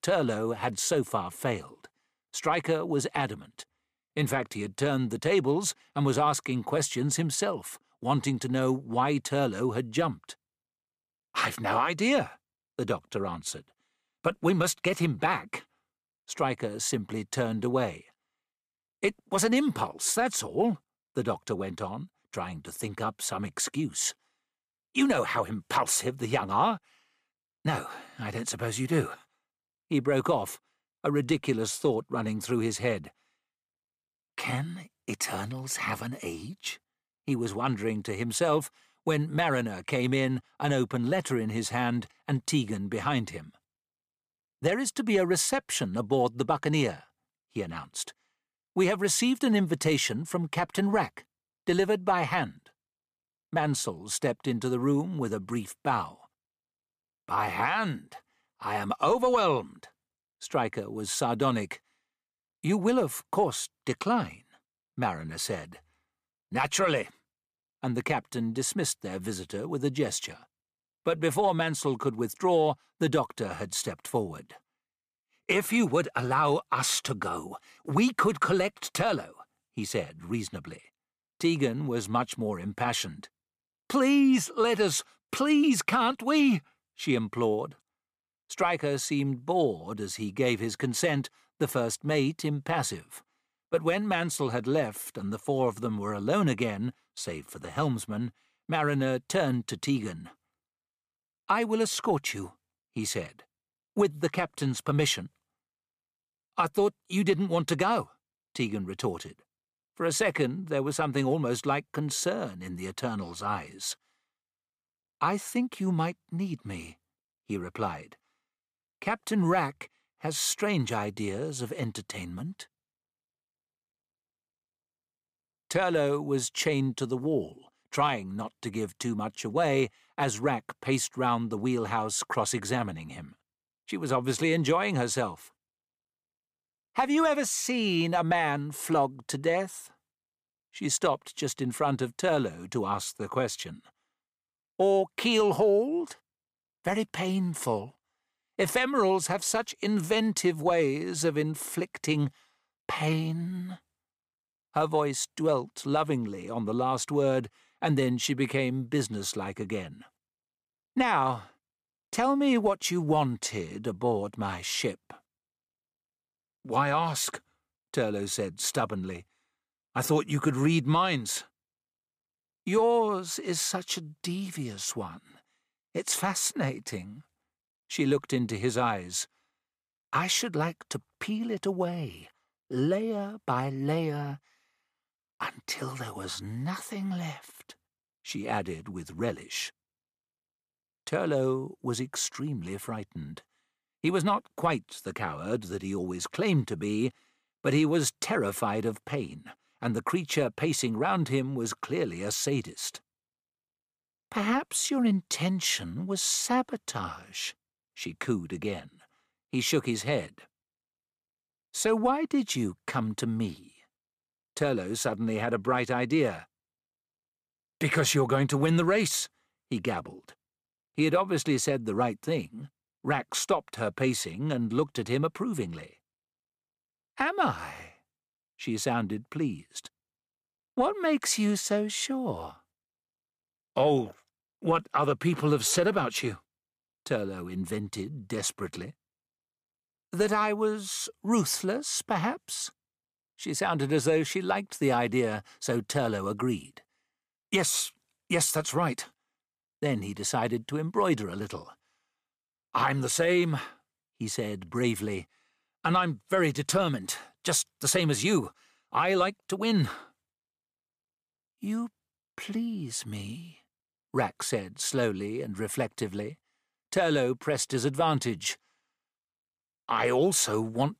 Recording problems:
none

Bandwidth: 15 kHz